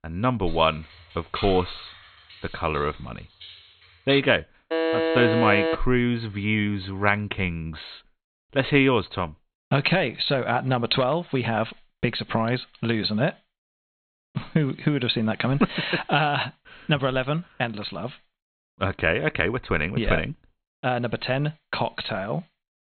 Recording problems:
high frequencies cut off; severe; nothing above 4 kHz
keyboard typing; noticeable; until 4 s; peak 6 dB below the speech
alarm; loud; from 4.5 to 6 s; peak 1 dB above the speech

